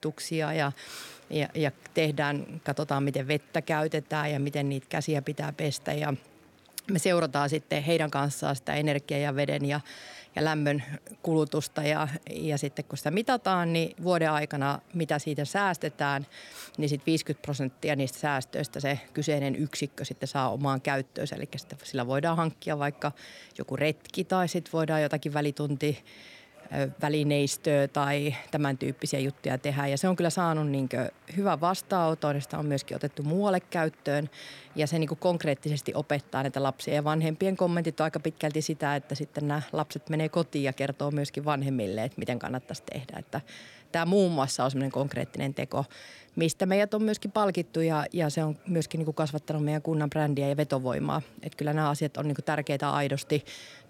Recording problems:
murmuring crowd; faint; throughout; 30 dB below the speech

